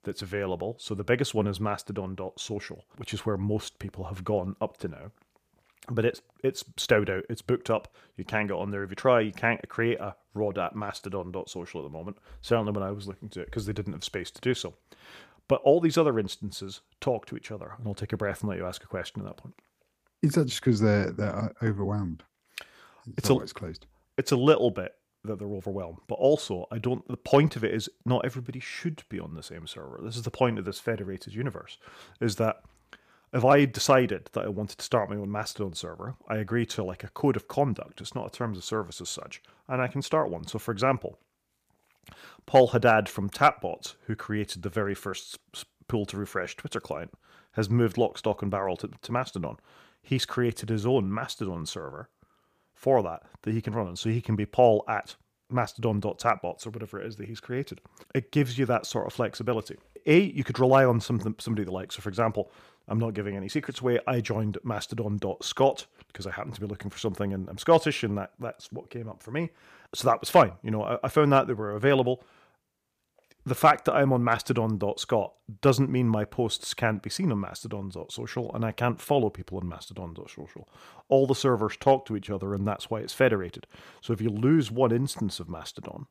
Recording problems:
none

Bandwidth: 15 kHz